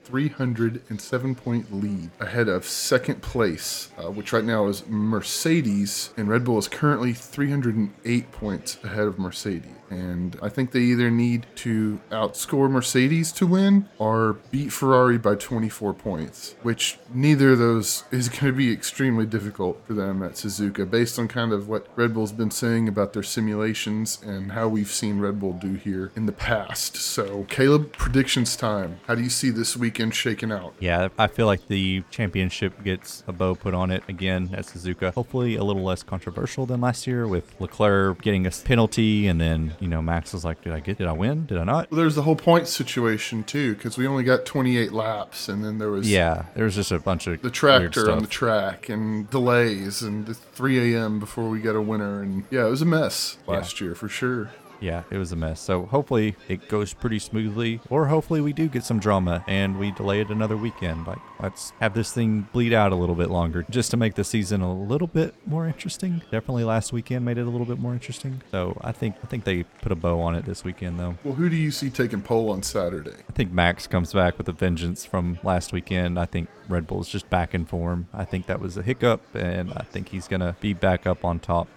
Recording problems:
murmuring crowd; faint; throughout; 25 dB below the speech

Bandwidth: 17.5 kHz